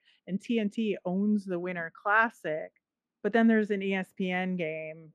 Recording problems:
muffled; slightly; fading above 3.5 kHz

